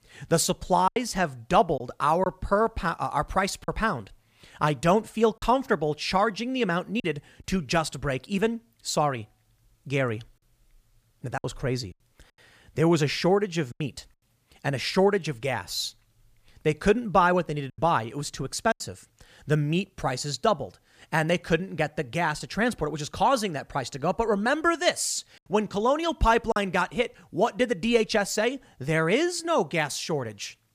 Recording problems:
choppy; occasionally; 3% of the speech affected

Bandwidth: 15 kHz